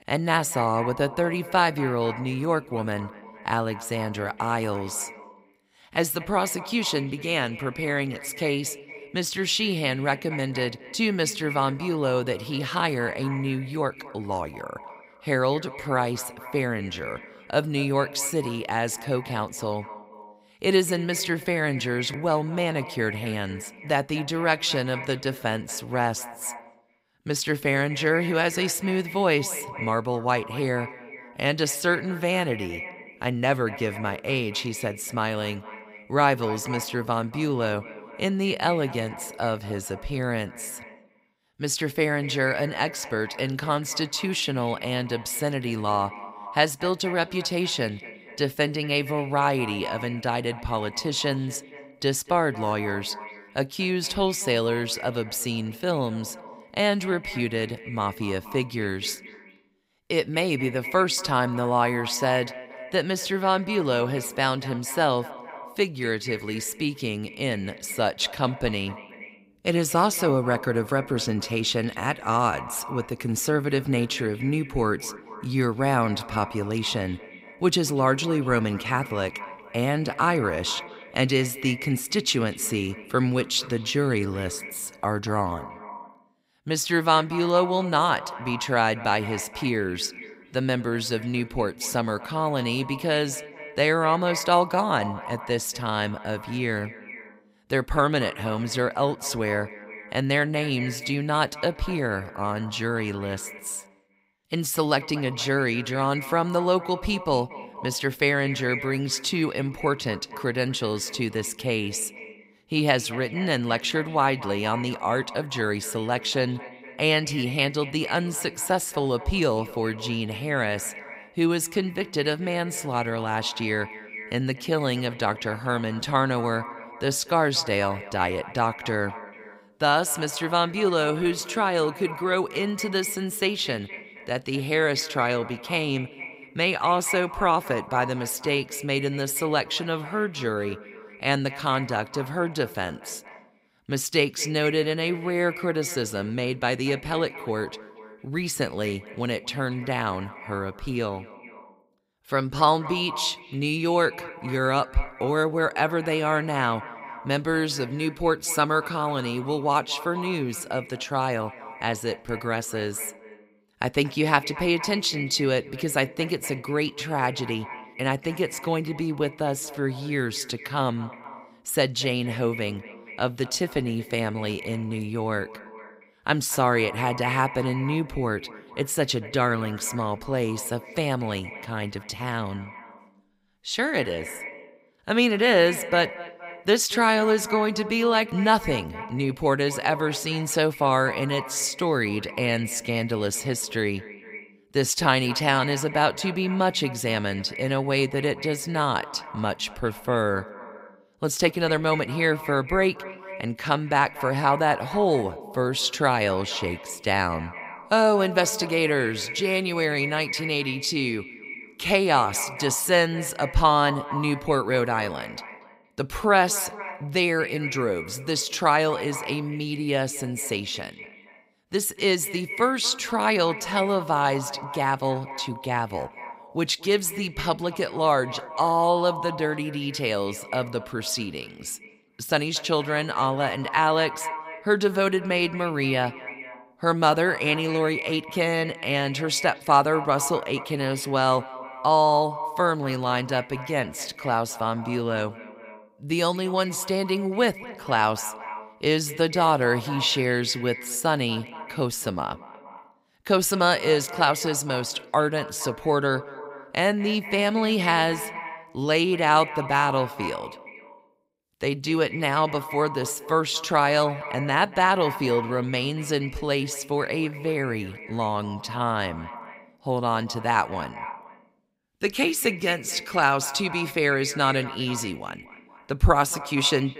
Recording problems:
echo of what is said; noticeable; throughout; 230 ms later, 15 dB below the speech

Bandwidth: 15.5 kHz